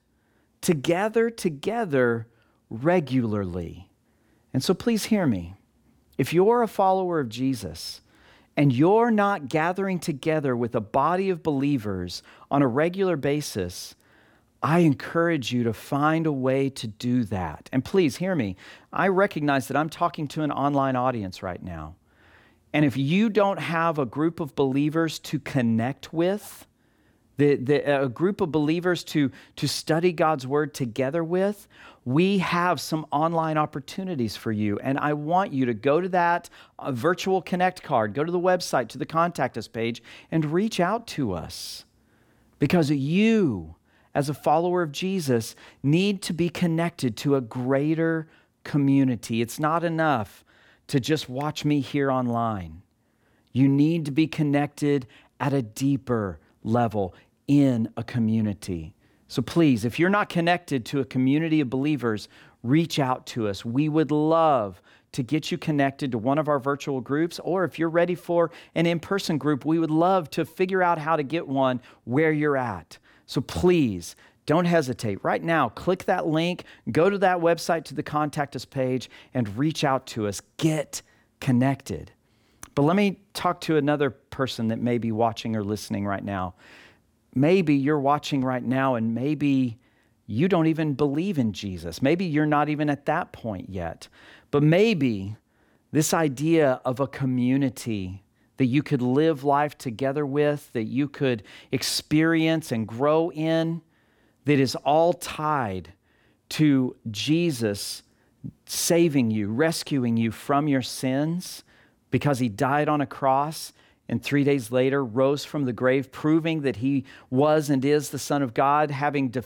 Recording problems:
none

